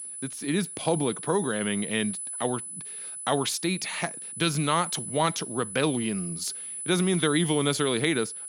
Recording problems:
high-pitched whine; loud; throughout; 10 kHz, 7 dB below the speech

